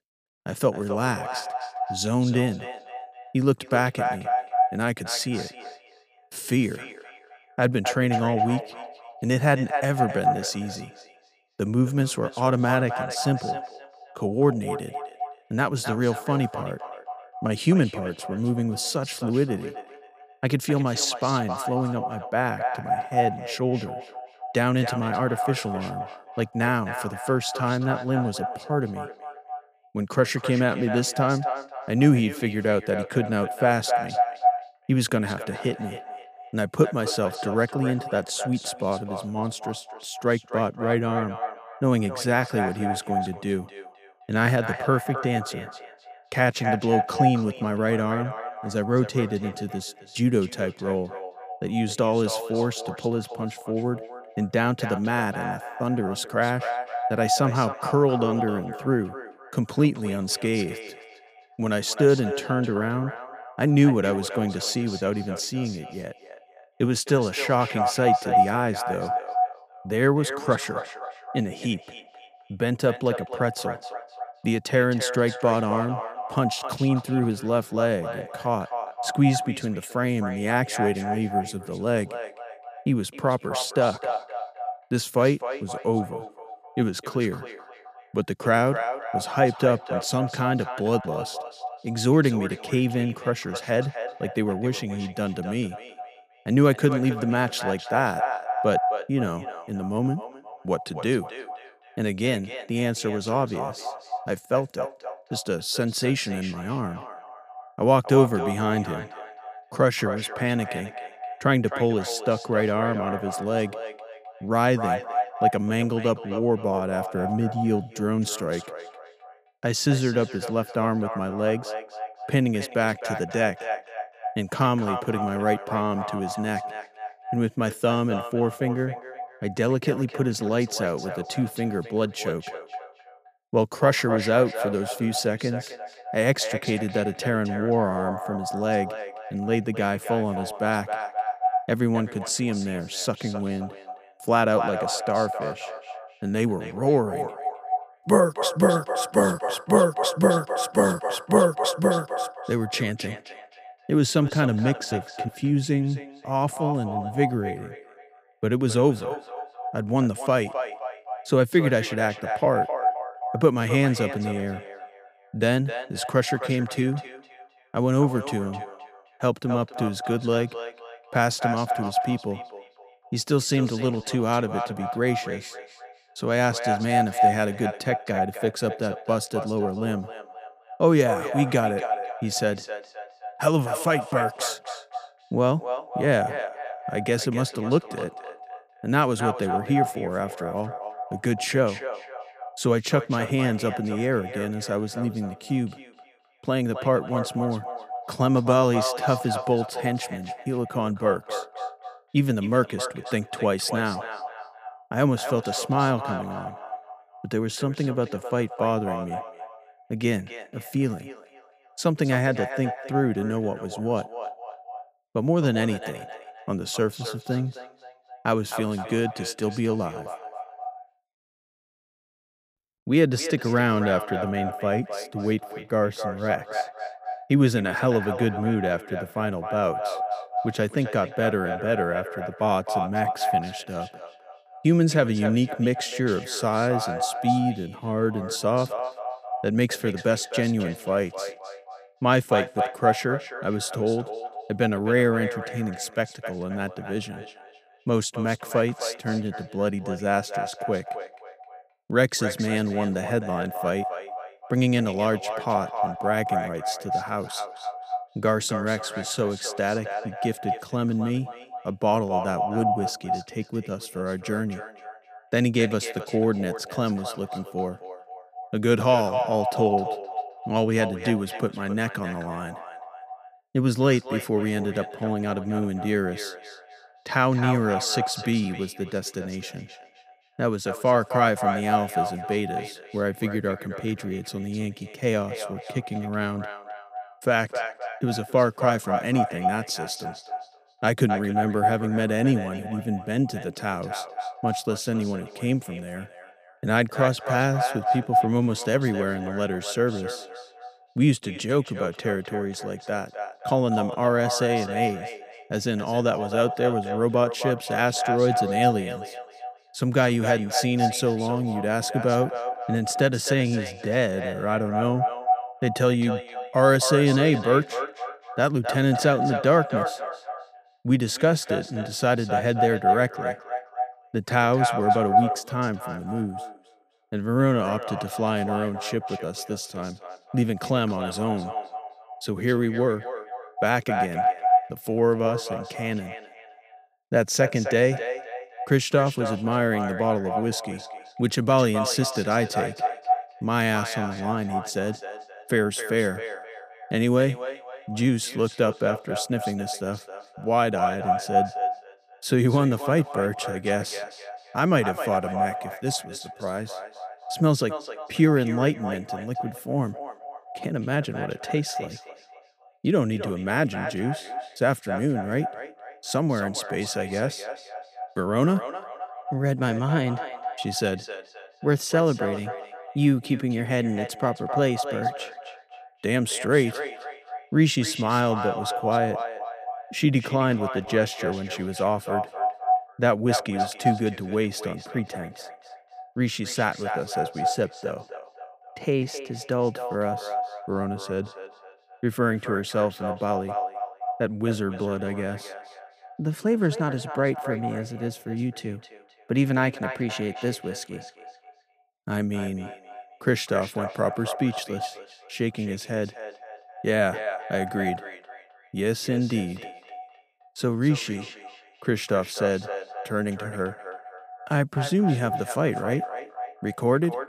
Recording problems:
echo of what is said; strong; throughout; 260 ms later, 7 dB below the speech

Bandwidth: 15 kHz